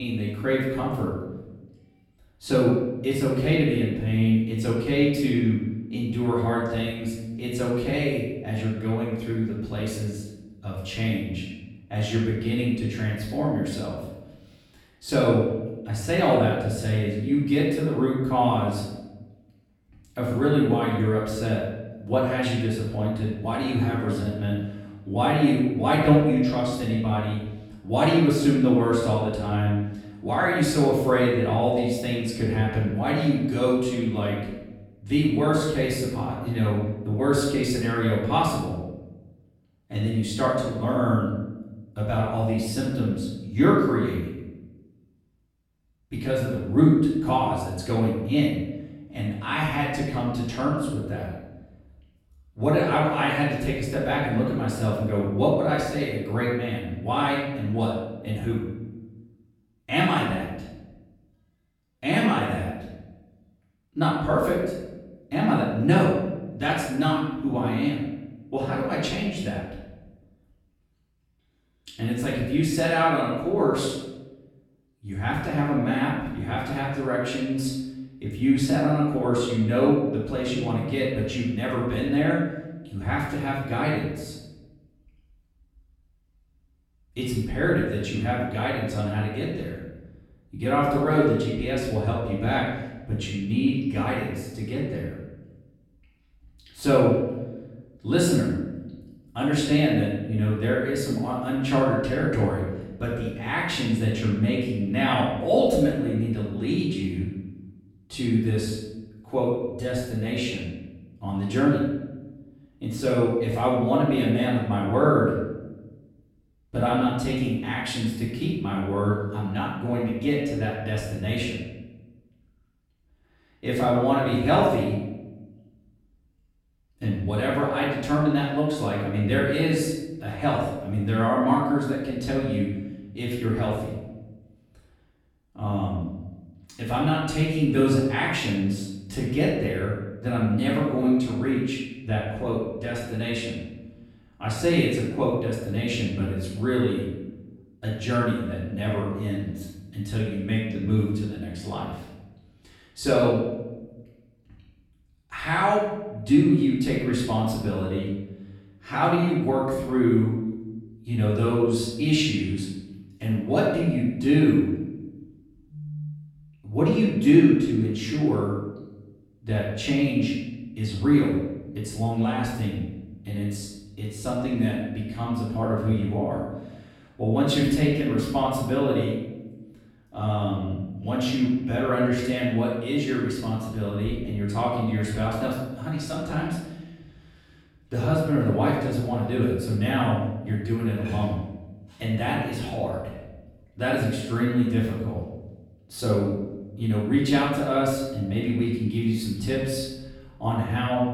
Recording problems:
off-mic speech; far
room echo; noticeable; dies away in 0.9 s
abrupt cut into speech; at the start

